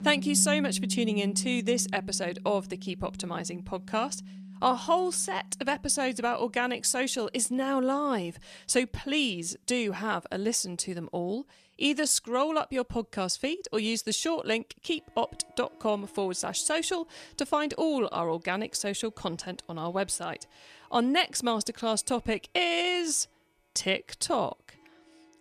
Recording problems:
background music; loud; throughout; 10 dB below the speech

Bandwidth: 14 kHz